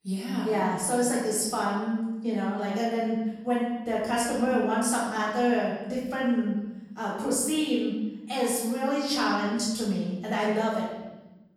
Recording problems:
off-mic speech; far
room echo; noticeable; dies away in 1.1 s

